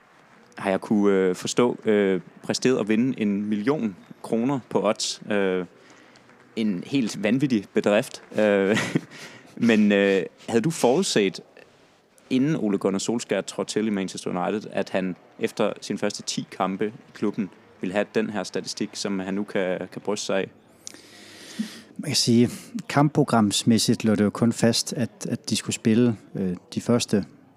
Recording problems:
murmuring crowd; faint; throughout; 30 dB below the speech

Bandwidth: 15.5 kHz